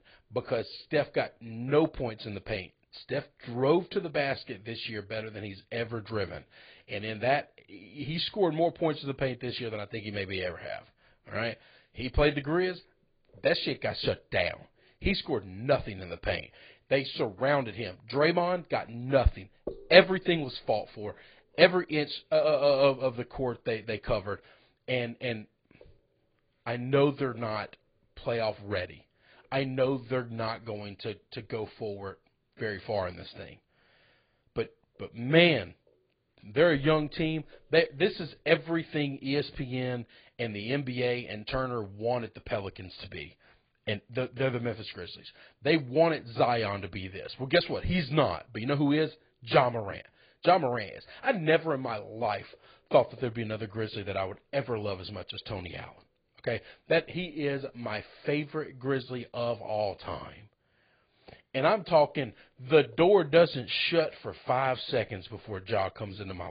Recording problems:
garbled, watery; badly
high frequencies cut off; severe; nothing above 4.5 kHz
abrupt cut into speech; at the end

